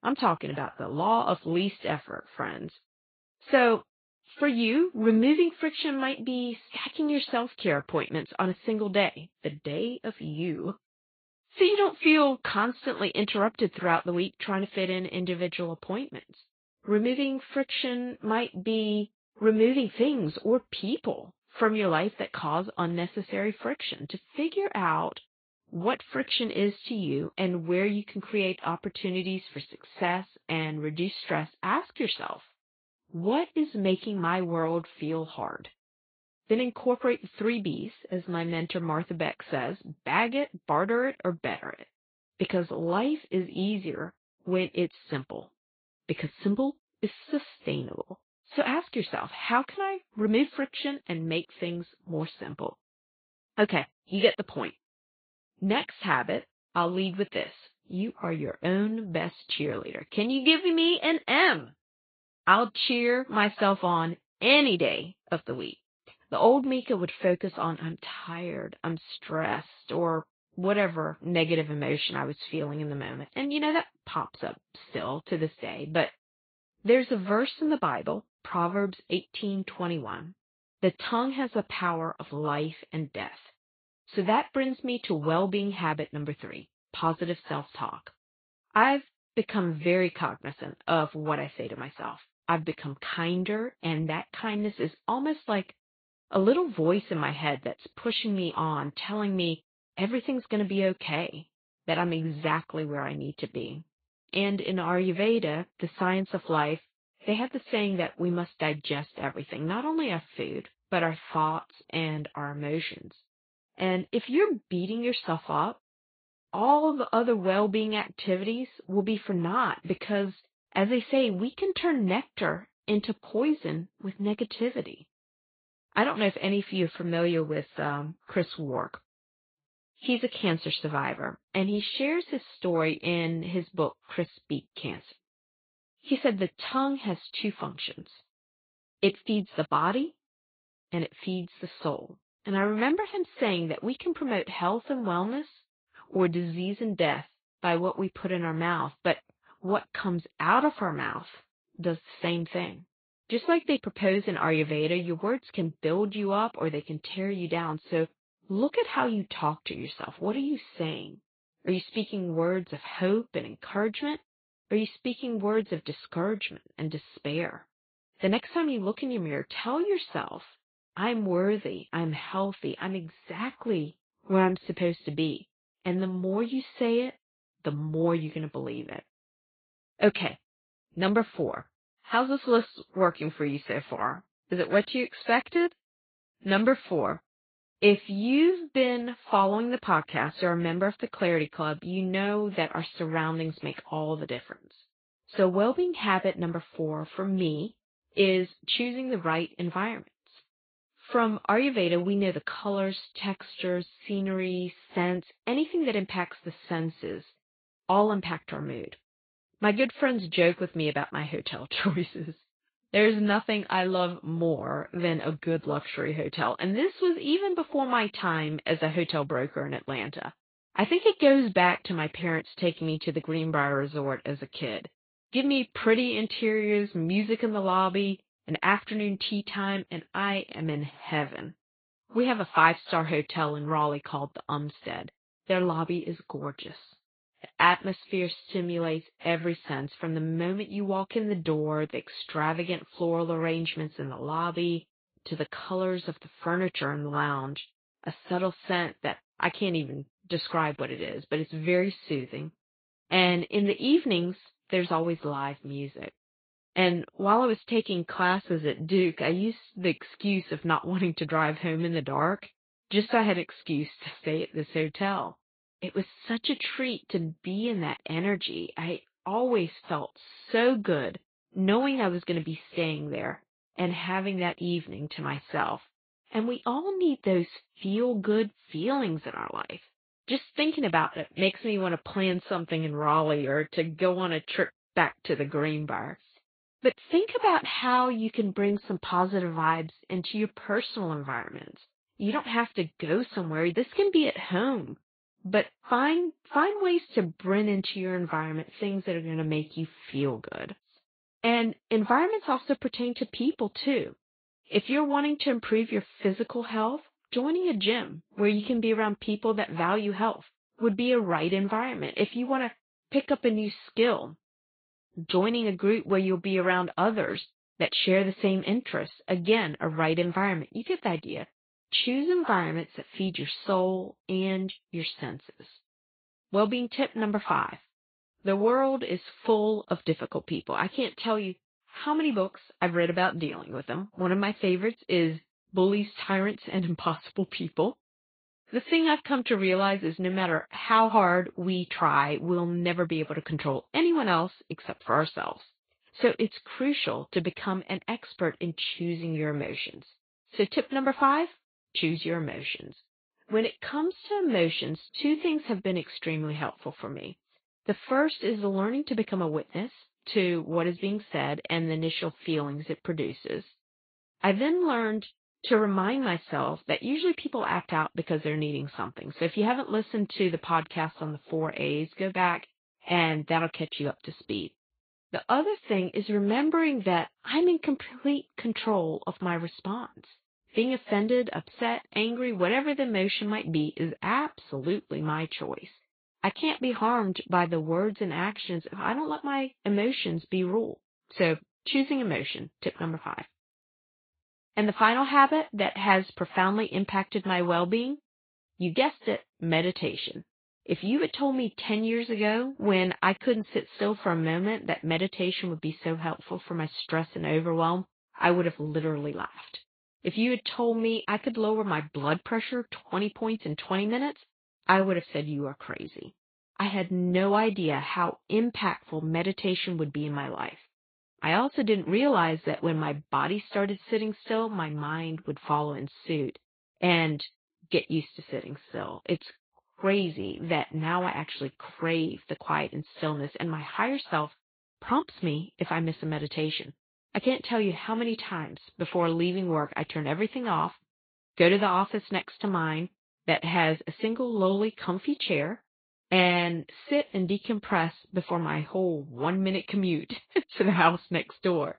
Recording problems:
high frequencies cut off; severe; nothing above 4.5 kHz
garbled, watery; slightly

